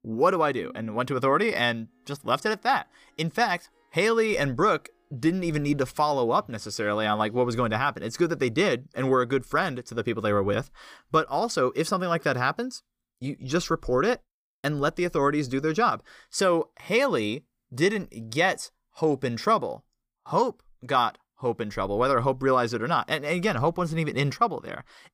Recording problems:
background music; faint; until 7.5 s; 30 dB below the speech

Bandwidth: 15 kHz